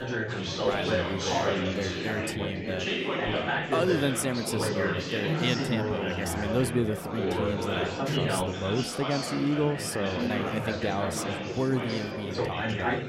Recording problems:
chatter from many people; very loud; throughout; 1 dB above the speech

